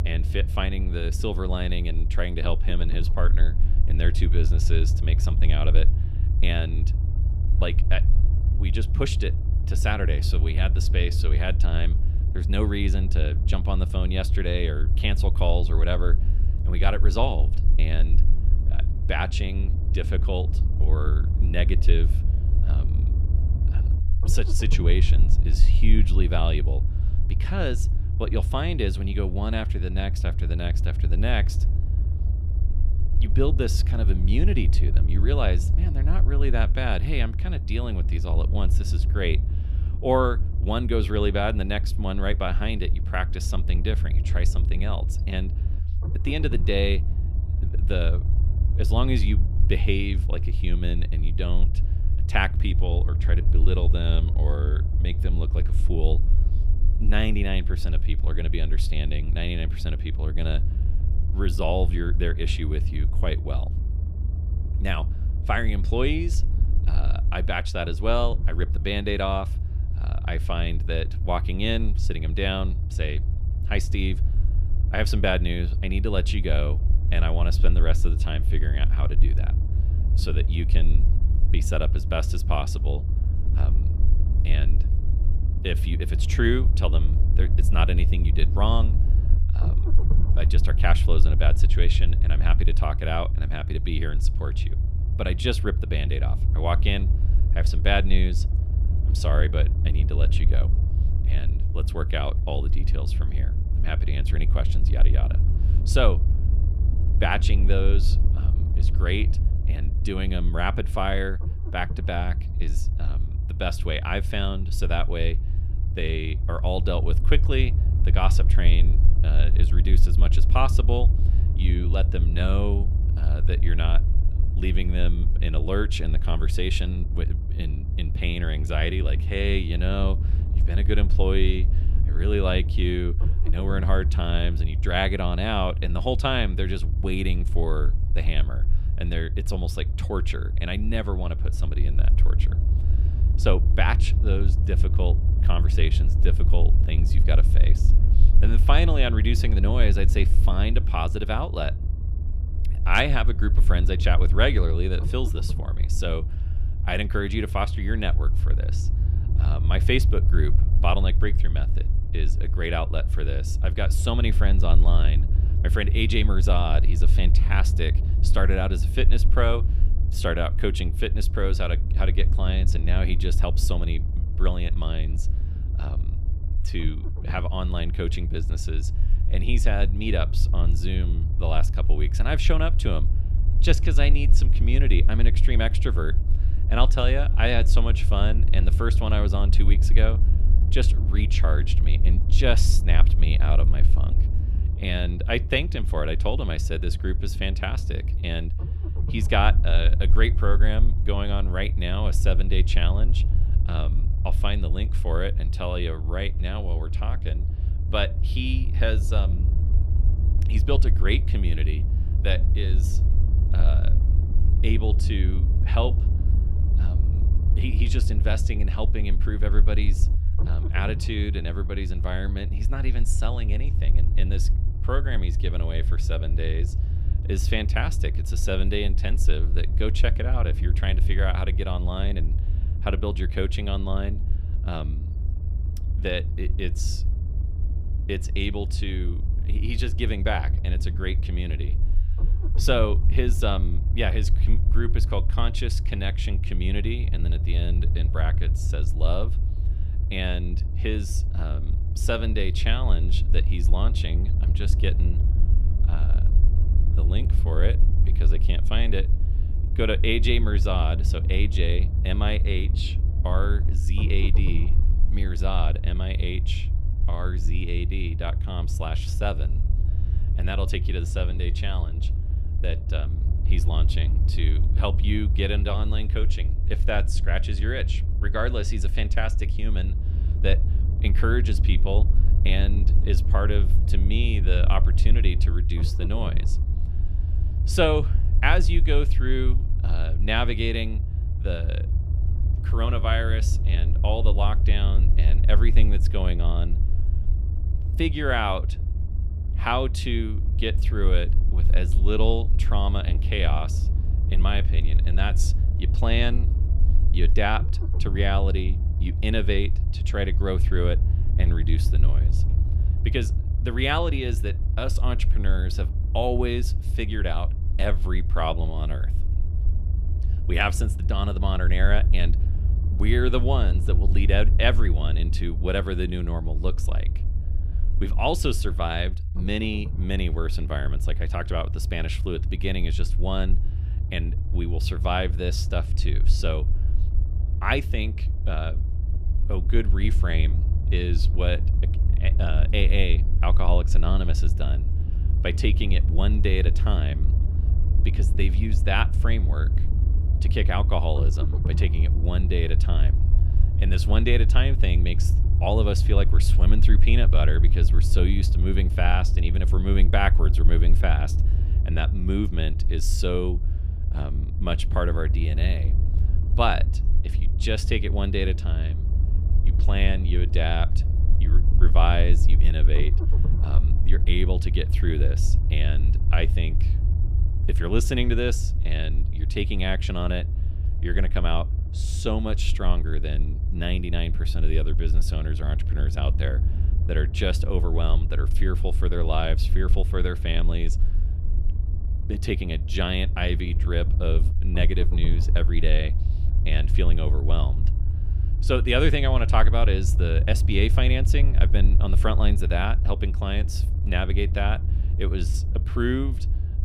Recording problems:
low rumble; noticeable; throughout; 10 dB below the speech

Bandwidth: 15.5 kHz